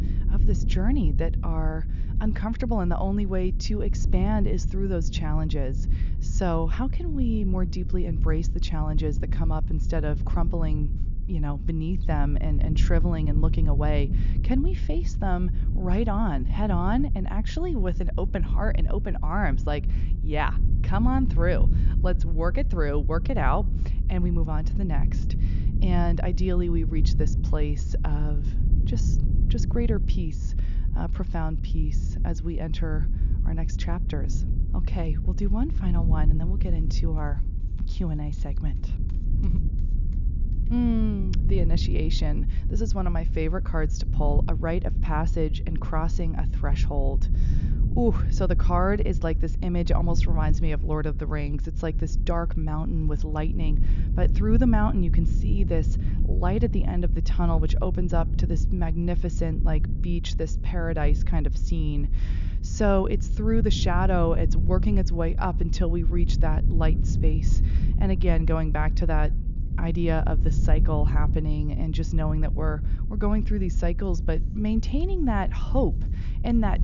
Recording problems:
high frequencies cut off; noticeable; nothing above 7 kHz
low rumble; noticeable; throughout; 10 dB below the speech

